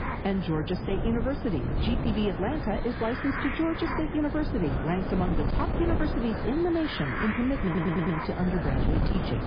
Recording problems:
garbled, watery; badly; nothing above 5 kHz
distortion; slight; 10% of the sound clipped
wind noise on the microphone; heavy; 10 dB below the speech
hiss; loud; throughout; 6 dB below the speech
audio stuttering; at 7.5 s

